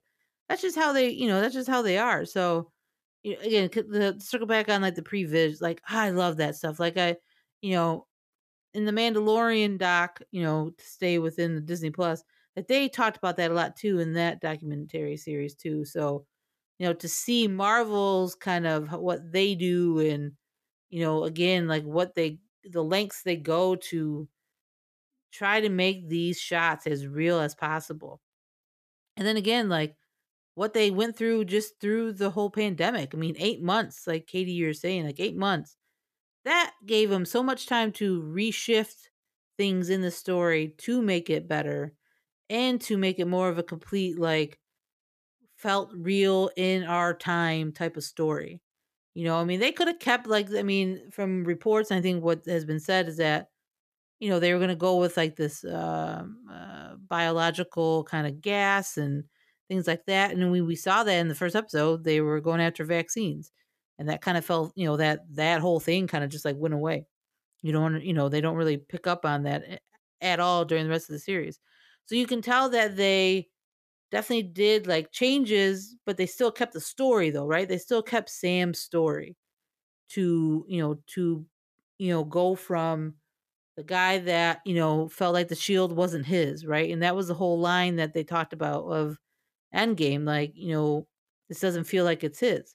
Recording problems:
none

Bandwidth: 14.5 kHz